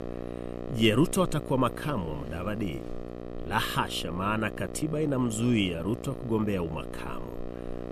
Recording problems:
electrical hum; noticeable; throughout; 60 Hz, 10 dB below the speech

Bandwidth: 14.5 kHz